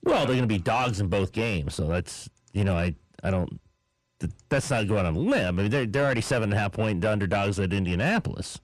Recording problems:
distortion; heavy; 7 dB below the speech

